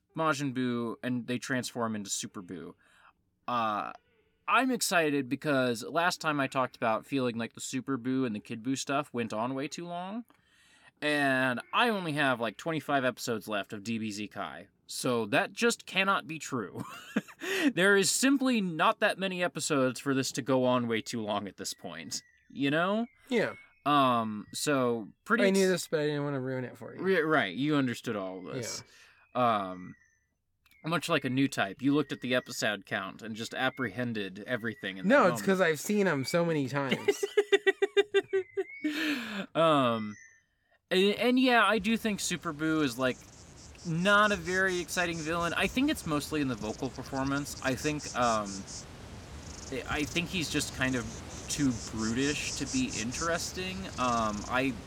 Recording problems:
animal sounds; noticeable; throughout; 15 dB below the speech

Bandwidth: 17.5 kHz